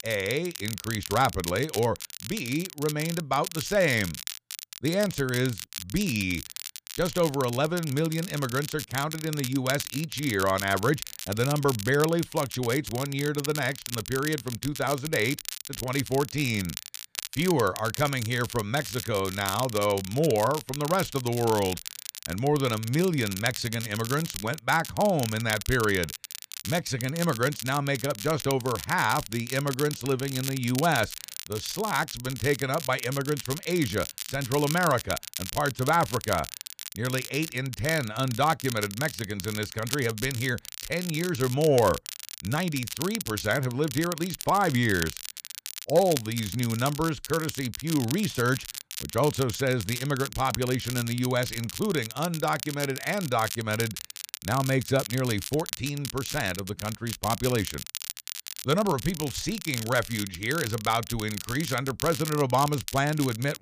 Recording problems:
crackle, like an old record; loud; 8 dB below the speech

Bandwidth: 15 kHz